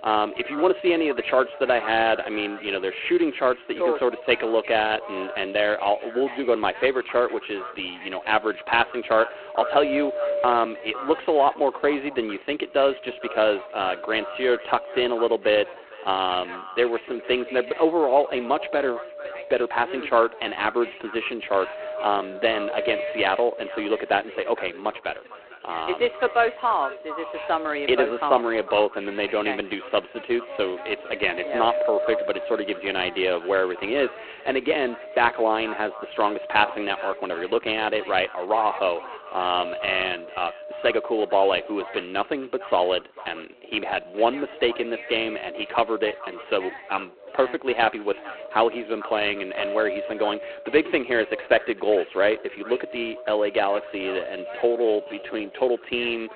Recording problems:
phone-call audio; poor line
echo of what is said; faint; throughout; 450 ms later, 20 dB below the speech
background chatter; noticeable; throughout; 2 voices, 20 dB below the speech
wind noise on the microphone; occasional gusts; 10 dB below the speech
uneven, jittery; slightly; from 10 to 55 s

